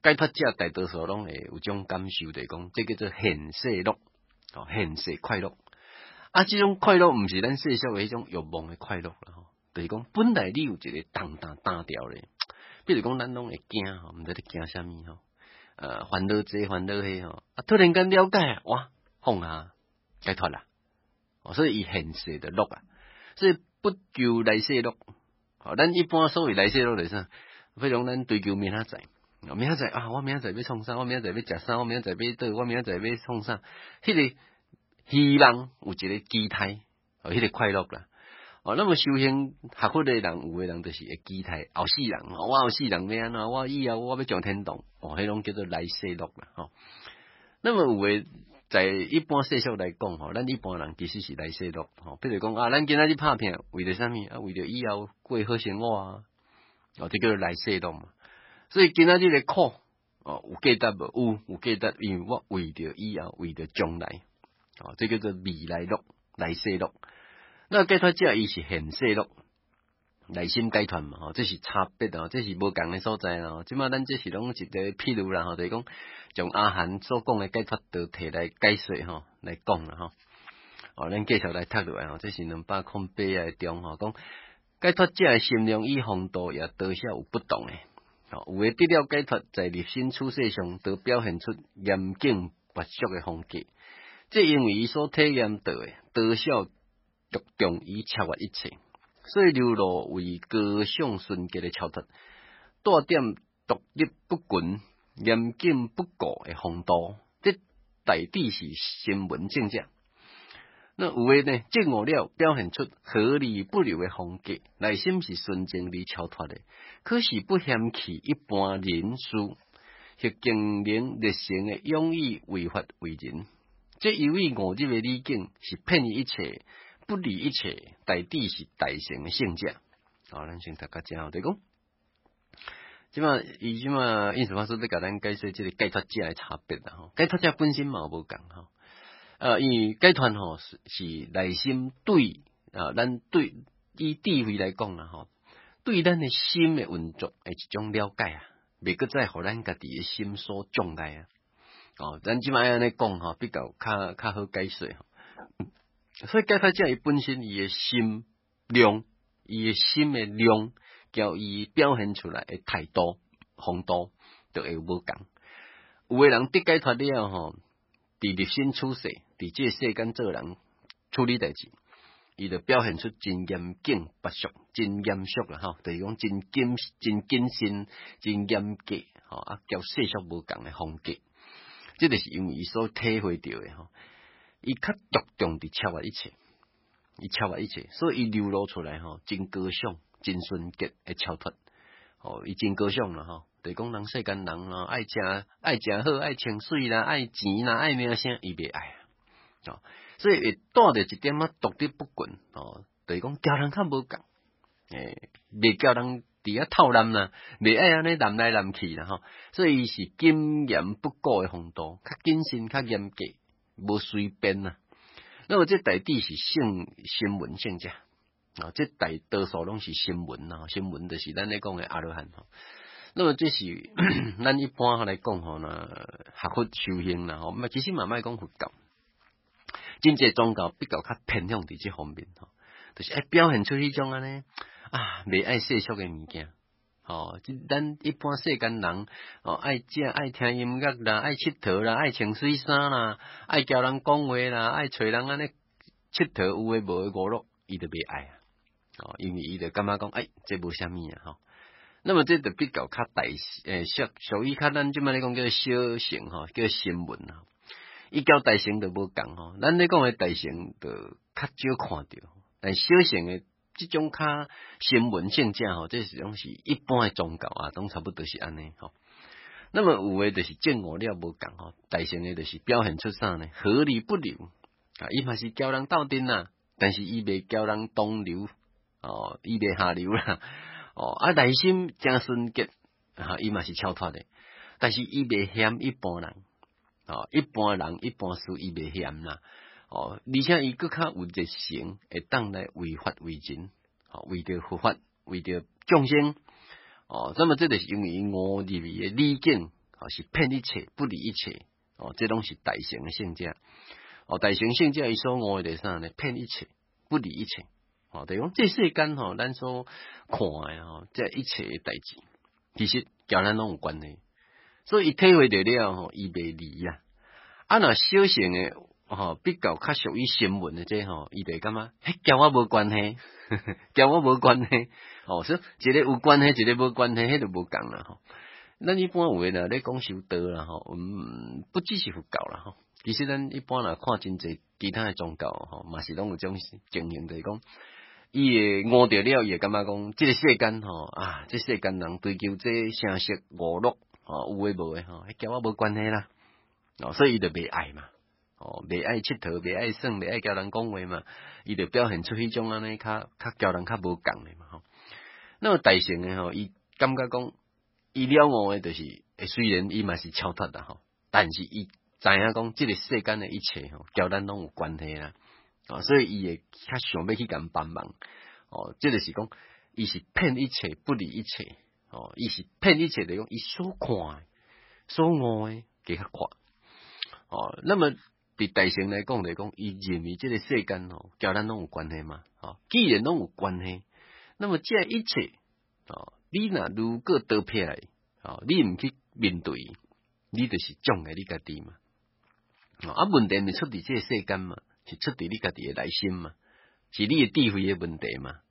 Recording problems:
garbled, watery; badly; nothing above 5.5 kHz

